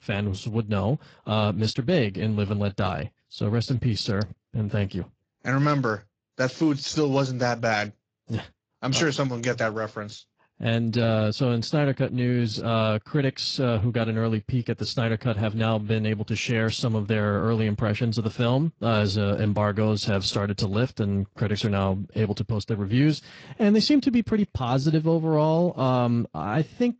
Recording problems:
garbled, watery; slightly; nothing above 7.5 kHz

